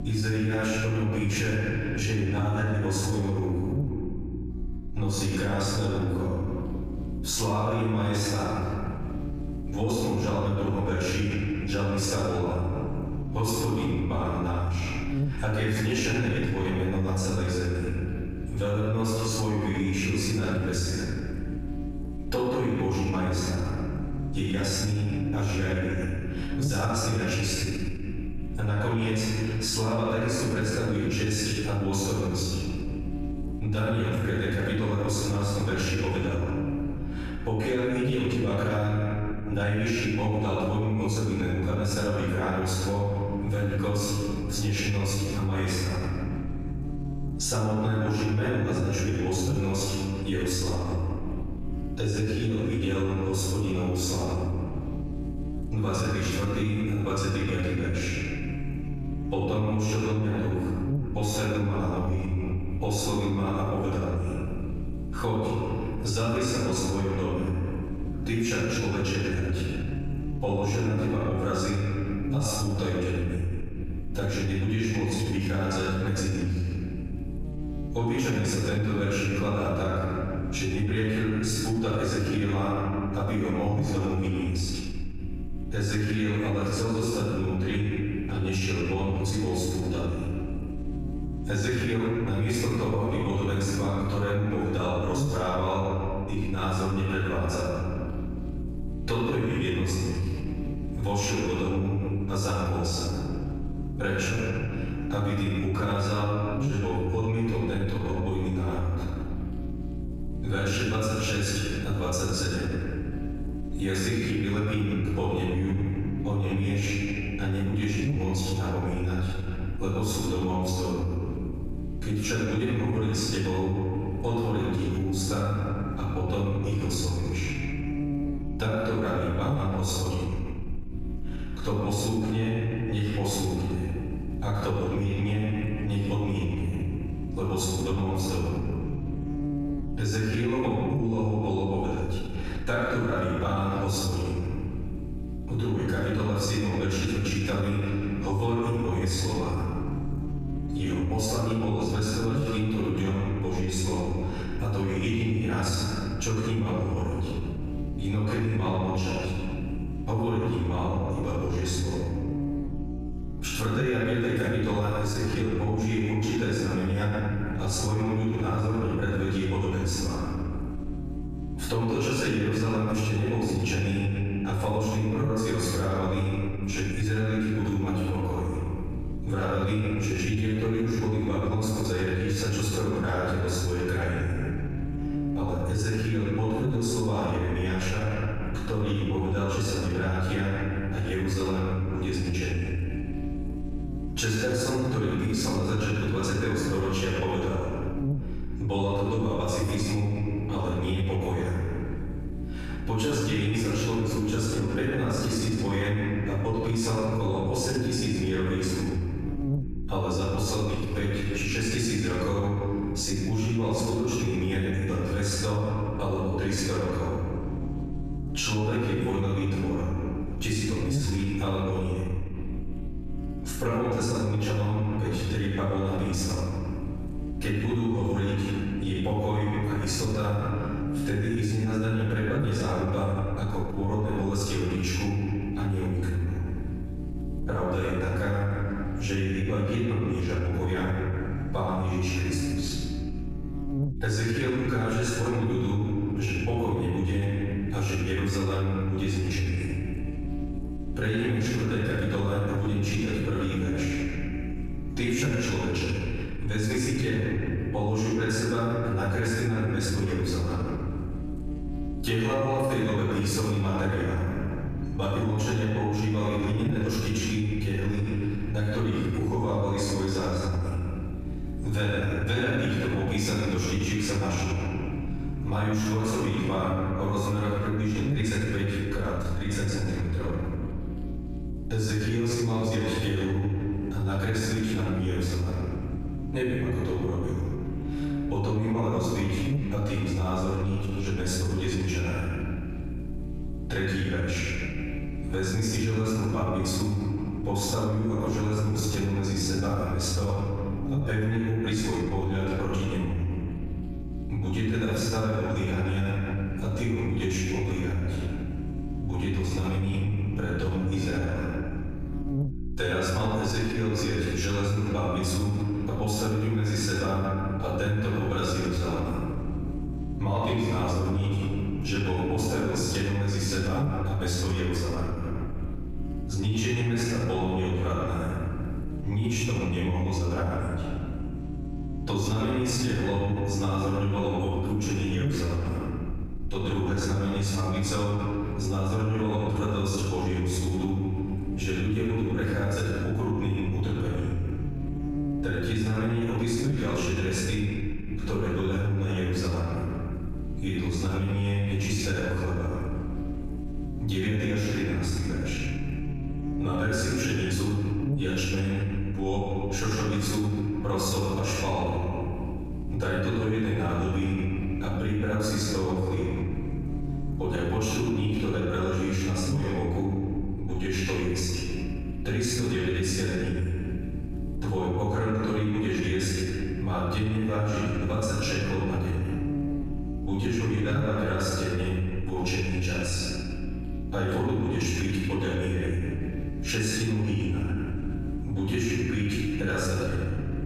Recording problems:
room echo; strong; dies away in 1.7 s
off-mic speech; far
squashed, flat; somewhat
electrical hum; noticeable; throughout; 60 Hz, 15 dB below the speech

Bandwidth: 14.5 kHz